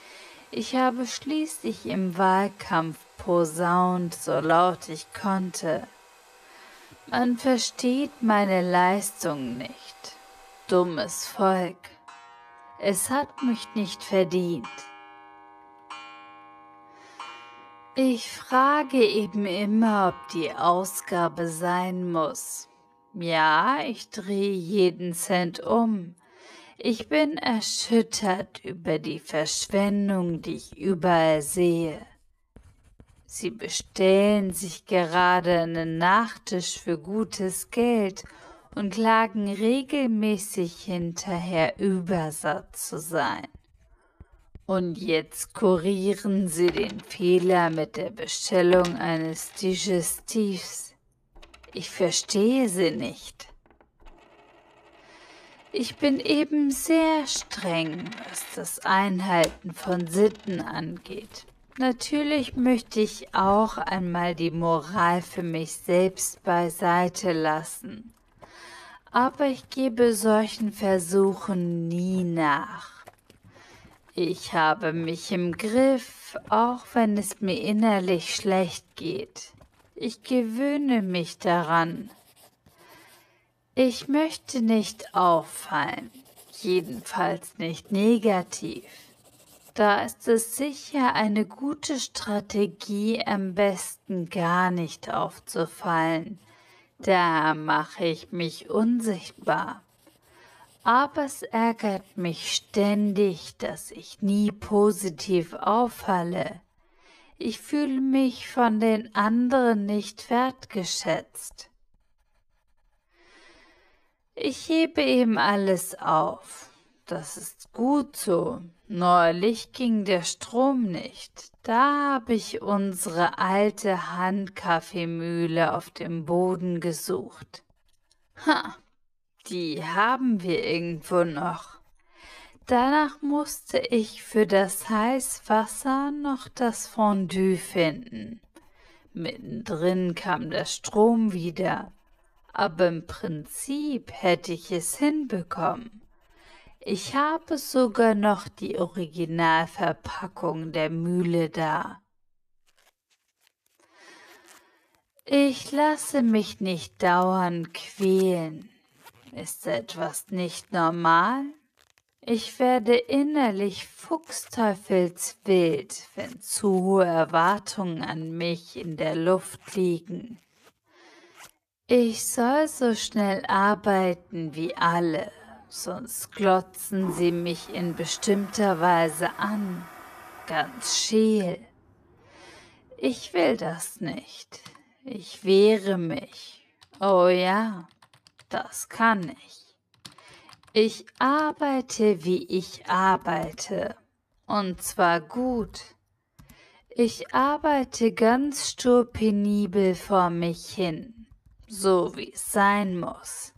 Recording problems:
wrong speed, natural pitch; too slow; 0.5 times normal speed
household noises; faint; throughout; 25 dB below the speech

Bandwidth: 14.5 kHz